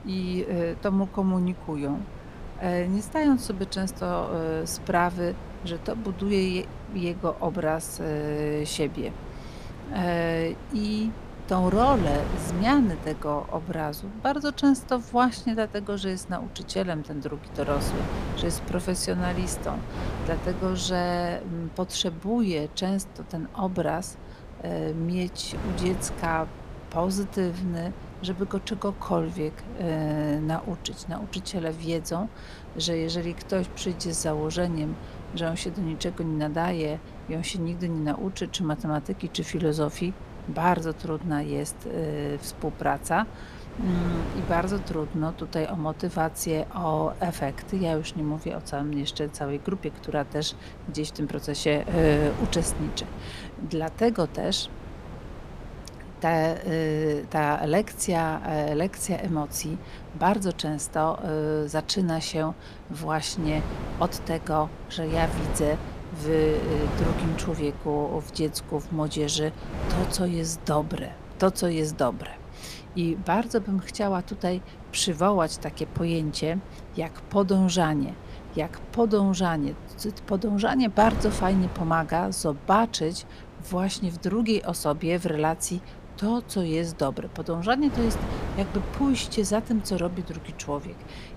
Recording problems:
wind noise on the microphone; occasional gusts; 15 dB below the speech

